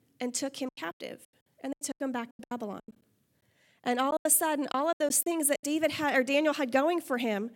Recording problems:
choppy; very; from 0.5 to 3 s and from 4 to 5.5 s; 22% of the speech affected

